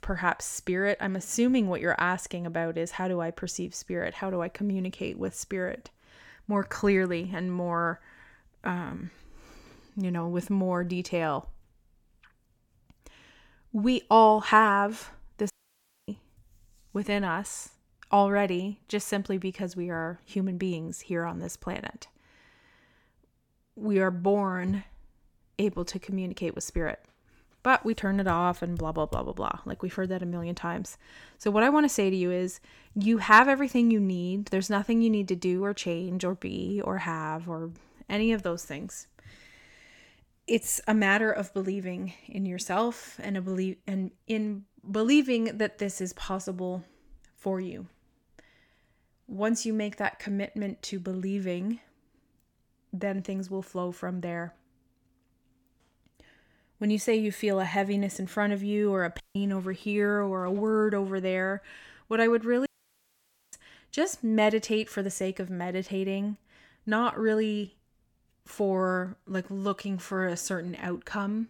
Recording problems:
audio cutting out; at 16 s for 0.5 s, at 59 s and at 1:03 for 1 s

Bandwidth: 18 kHz